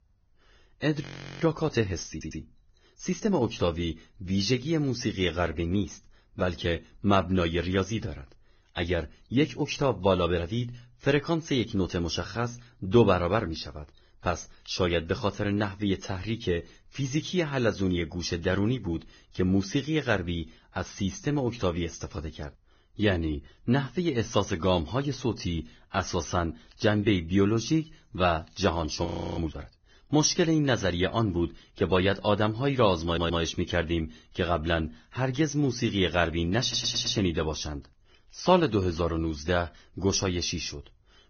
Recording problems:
garbled, watery; badly; nothing above 6.5 kHz
audio freezing; at 1 s and at 29 s
audio stuttering; at 2 s, at 33 s and at 37 s

